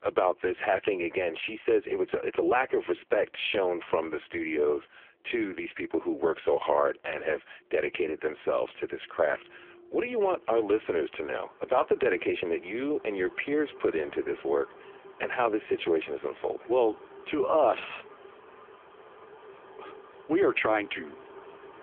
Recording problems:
phone-call audio; poor line; nothing above 3.5 kHz
traffic noise; faint; throughout; 20 dB below the speech

